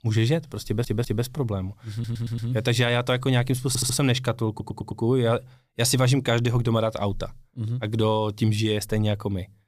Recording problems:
audio stuttering; 4 times, first at 0.5 s

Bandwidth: 15 kHz